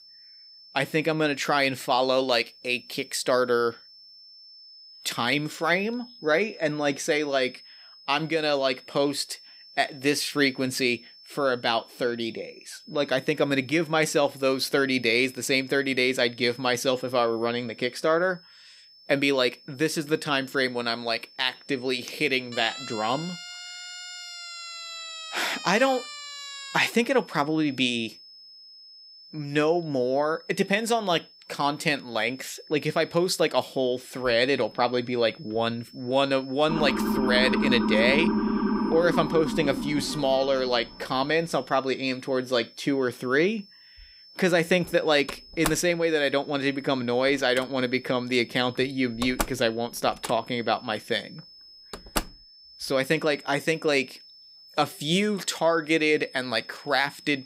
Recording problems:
high-pitched whine; faint; throughout; 5 kHz, 20 dB below the speech
siren; faint; from 23 to 27 s; peak 10 dB below the speech
siren; loud; from 37 to 41 s; peak 1 dB above the speech
door banging; noticeable; from 45 to 52 s; peak 6 dB below the speech

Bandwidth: 15.5 kHz